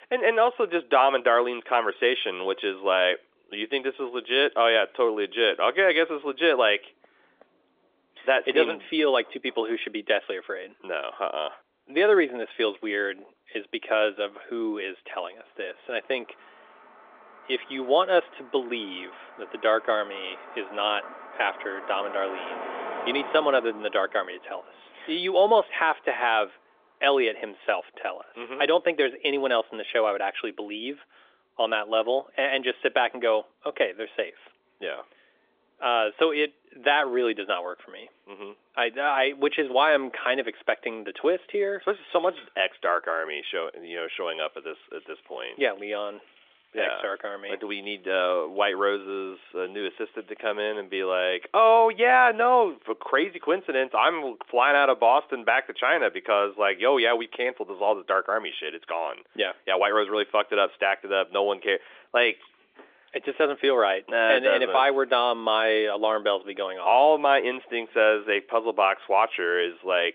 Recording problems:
phone-call audio; nothing above 3.5 kHz
traffic noise; noticeable; throughout; 20 dB below the speech

